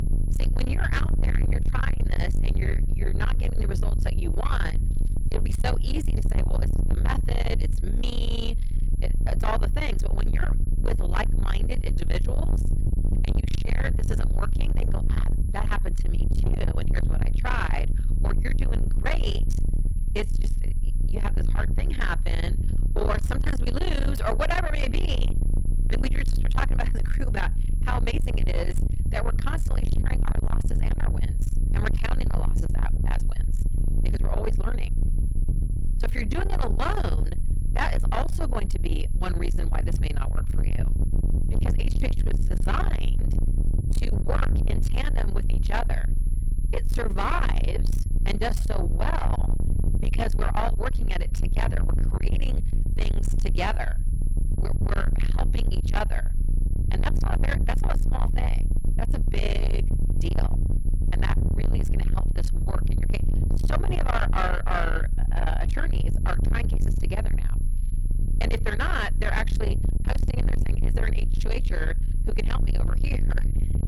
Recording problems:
distortion; heavy; 5 dB below the speech
low rumble; loud; throughout; 6 dB below the speech
high-pitched whine; faint; throughout; 11 kHz, 20 dB below the speech

